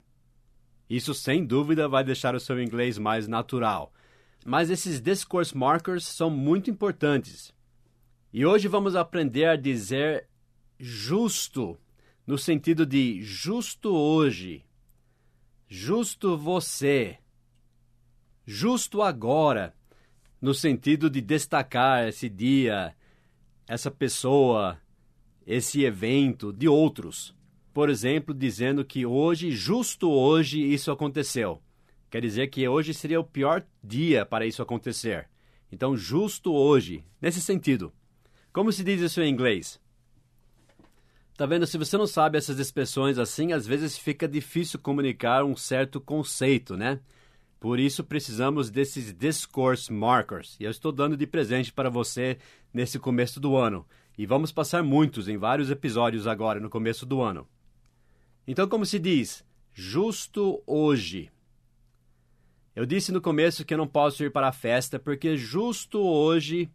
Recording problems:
none

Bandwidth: 14.5 kHz